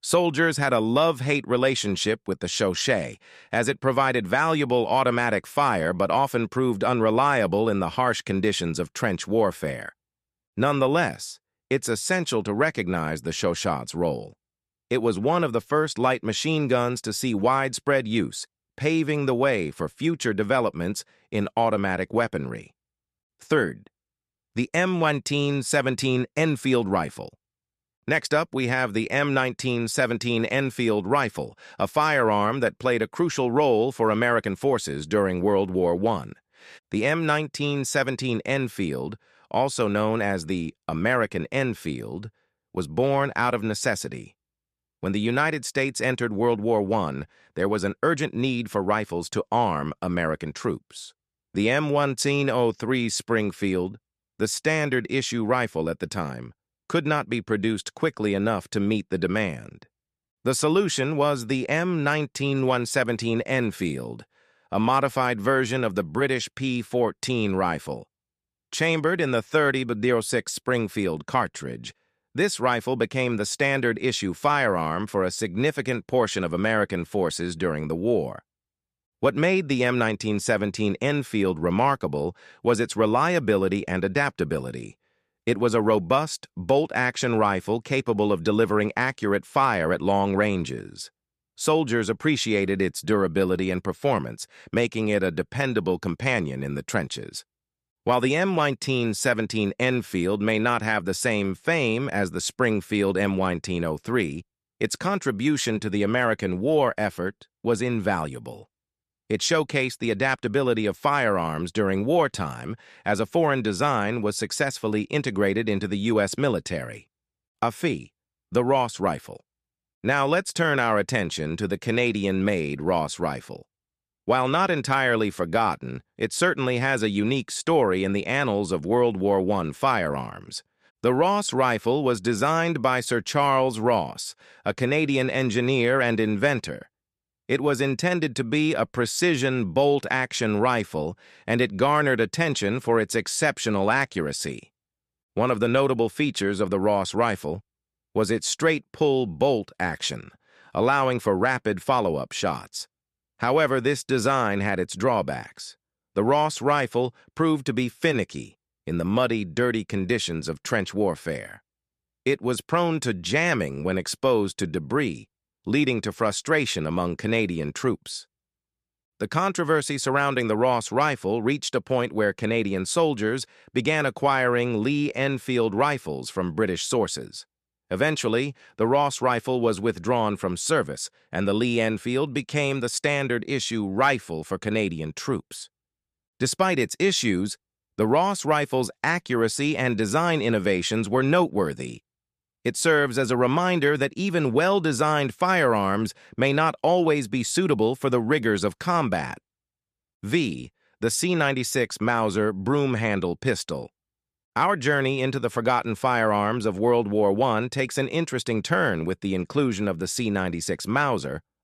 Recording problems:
none

